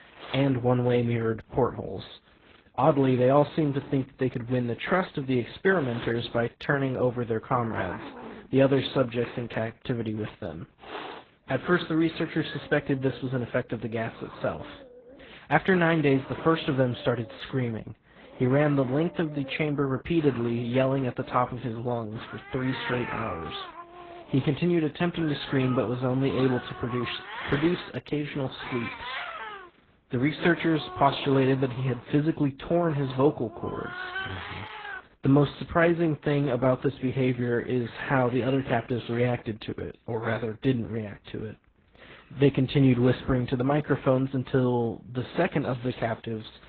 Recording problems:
garbled, watery; badly; nothing above 4 kHz
animal sounds; noticeable; throughout; 15 dB below the speech

